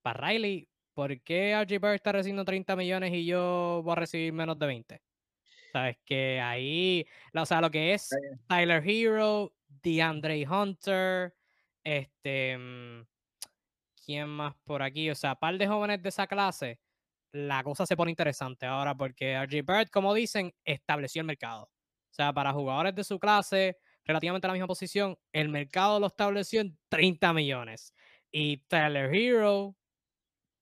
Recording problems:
uneven, jittery; strongly; from 1 to 30 s

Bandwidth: 15 kHz